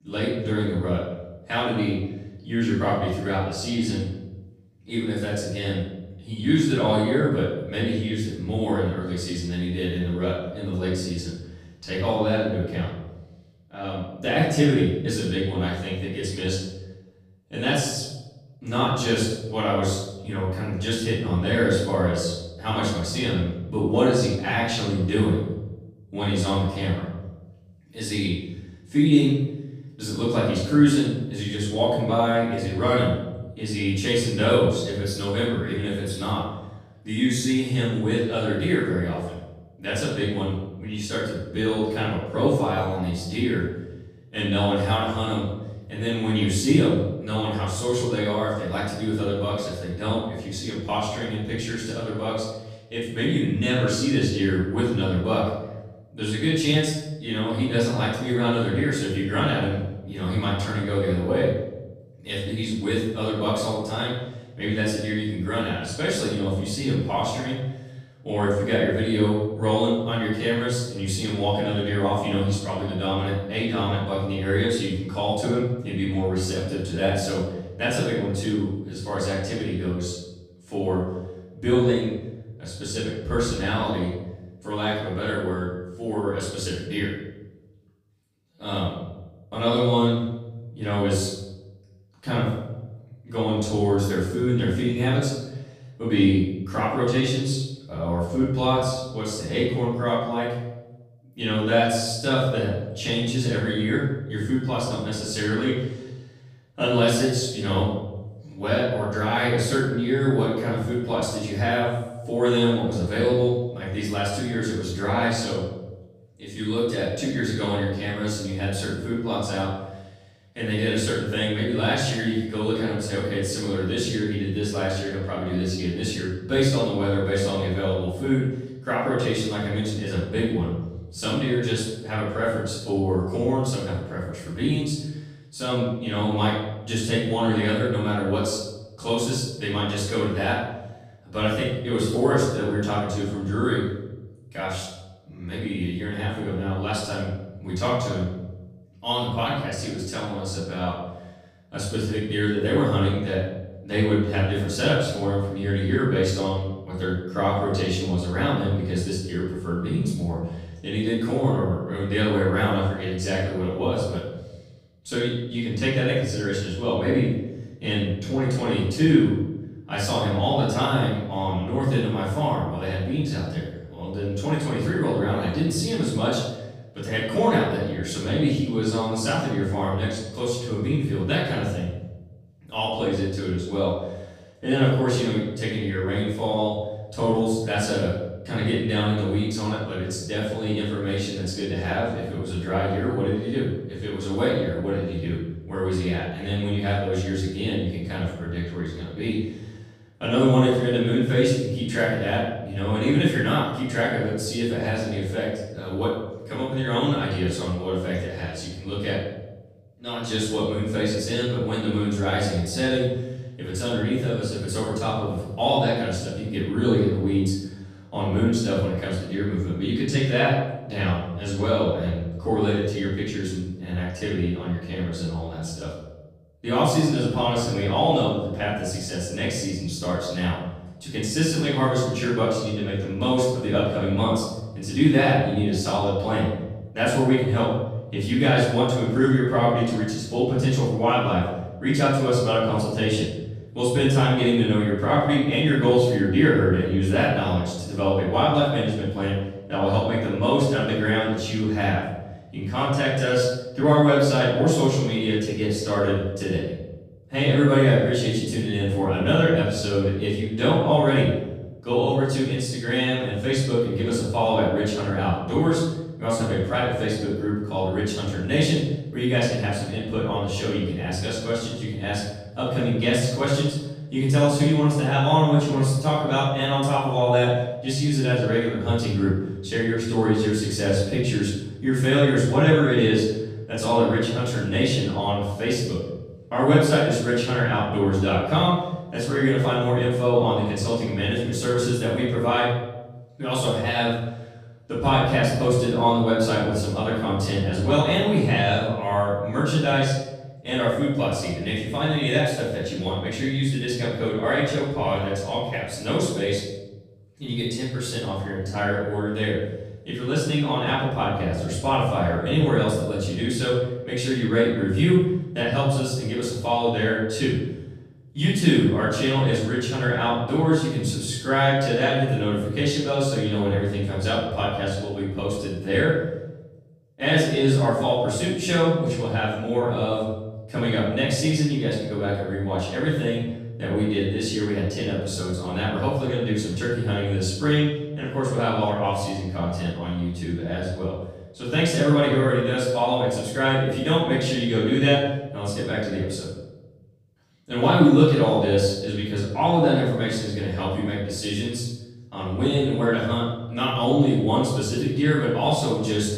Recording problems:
off-mic speech; far
room echo; noticeable; dies away in 0.9 s

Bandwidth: 15.5 kHz